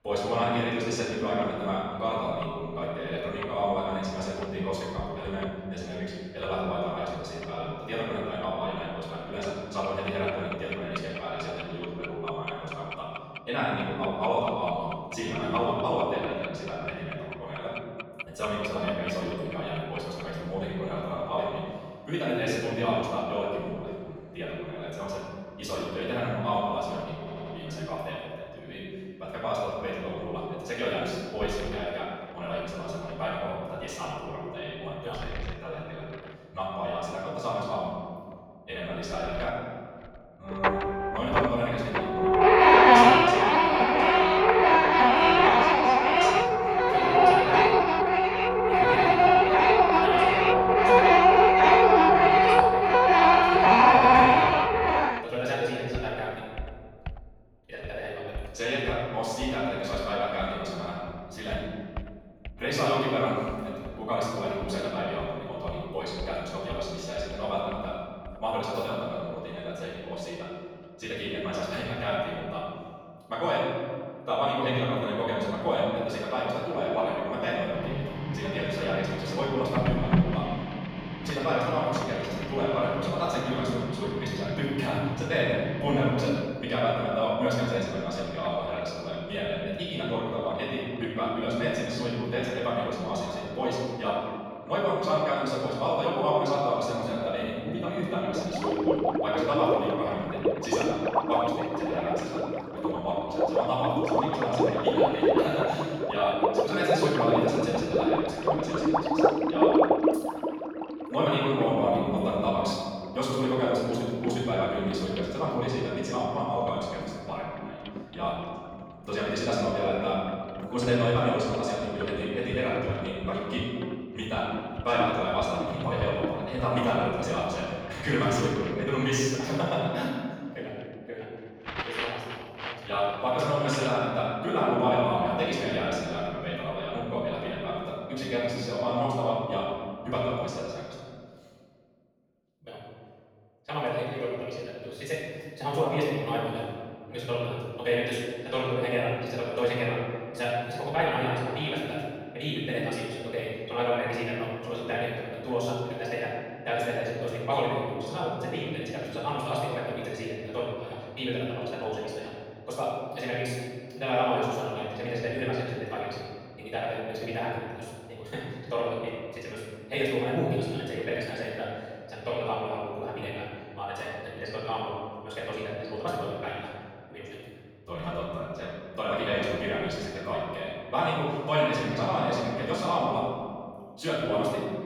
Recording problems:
room echo; strong; dies away in 1.8 s
off-mic speech; far
wrong speed, natural pitch; too fast; 1.7 times normal speed
household noises; very loud; until 2:15; 8 dB above the speech
audio stuttering; at 27 s

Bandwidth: 18 kHz